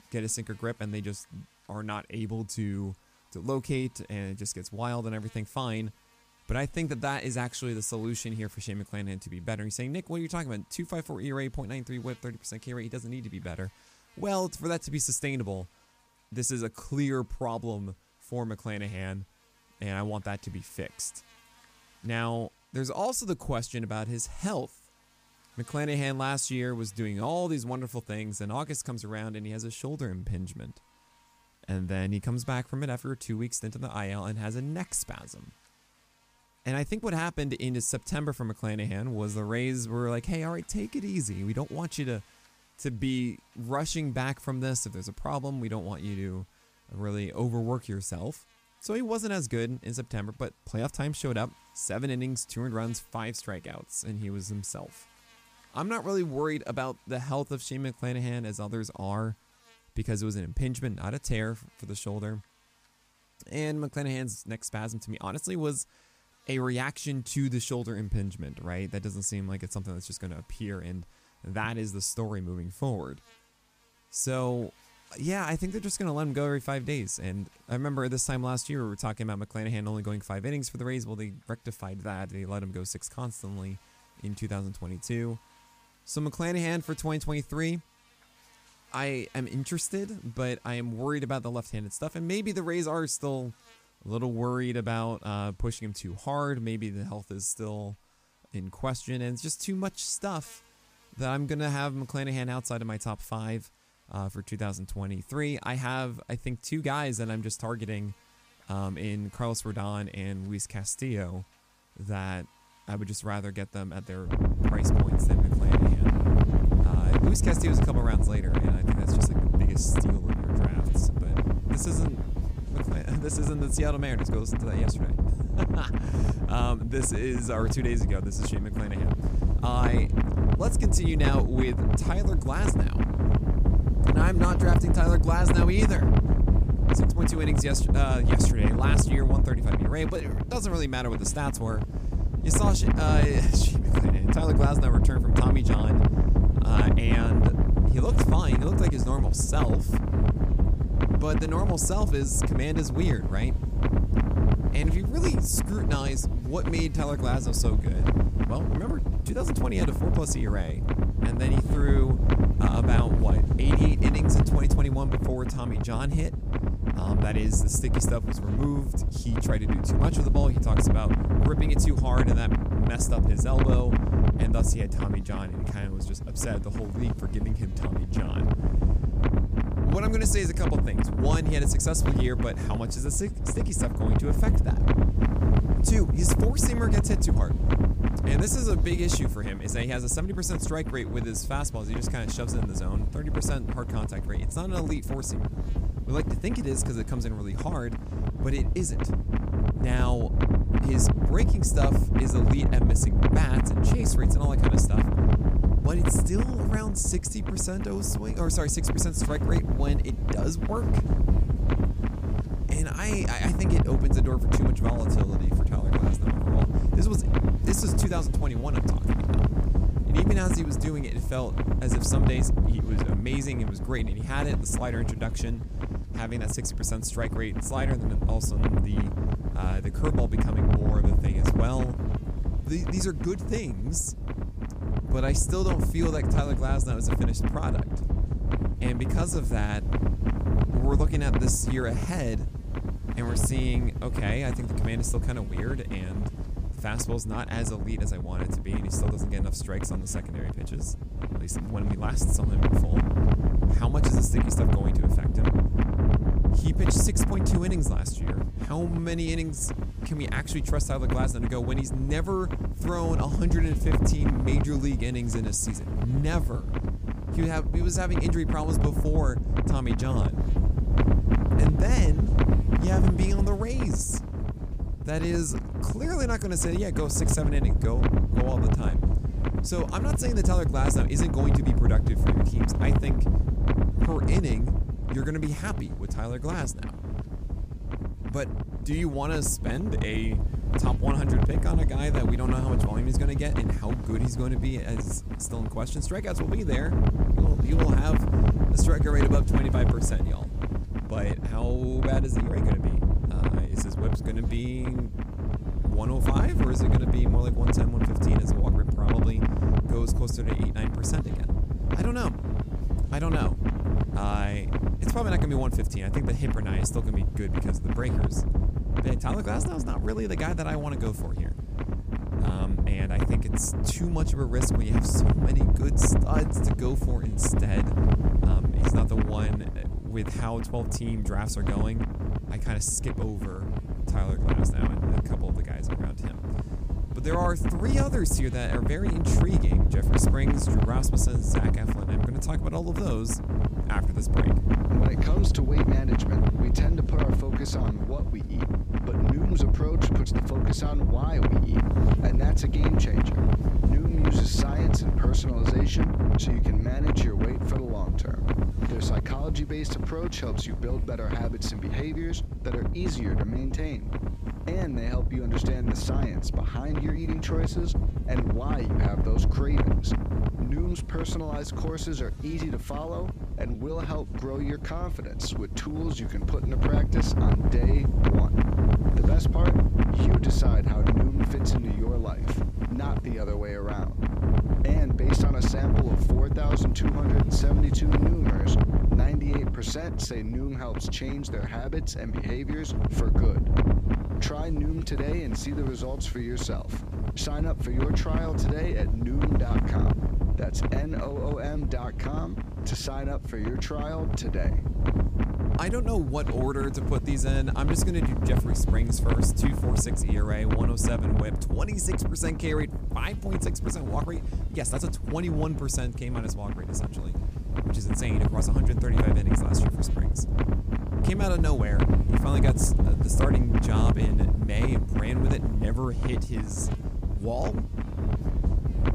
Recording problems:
wind noise on the microphone; heavy; from 1:54 on; 1 dB below the speech
electrical hum; faint; throughout; 50 Hz, 25 dB below the speech

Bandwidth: 15 kHz